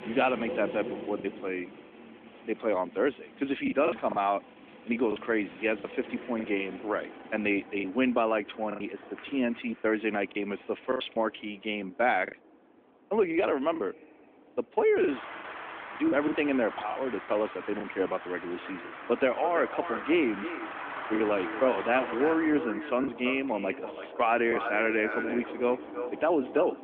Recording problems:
echo of what is said; strong; from 19 s on; 330 ms later, 9 dB below the speech
phone-call audio; nothing above 3.5 kHz
traffic noise; noticeable; throughout; 10 dB below the speech
choppy; occasionally; 5% of the speech affected

